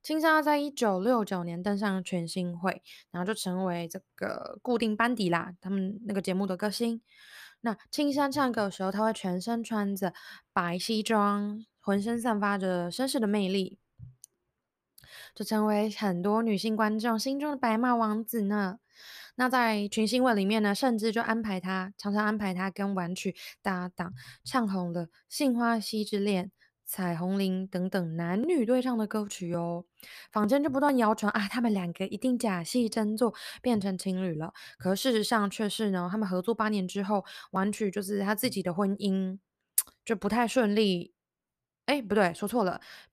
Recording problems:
none

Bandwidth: 14.5 kHz